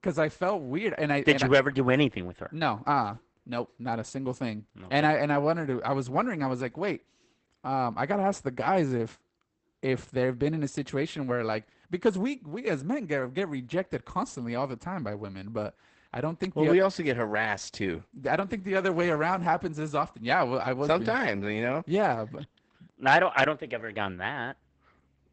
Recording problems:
garbled, watery; badly; nothing above 8 kHz

